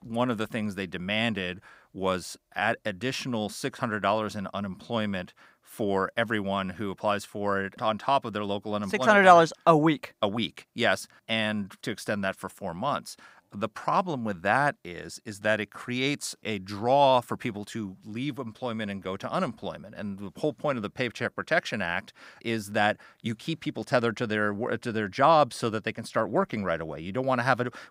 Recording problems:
none

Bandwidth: 15.5 kHz